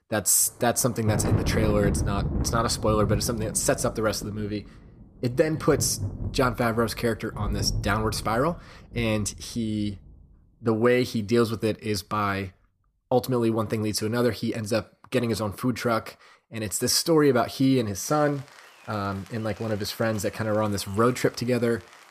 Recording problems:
rain or running water; loud; throughout; 7 dB below the speech

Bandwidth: 14.5 kHz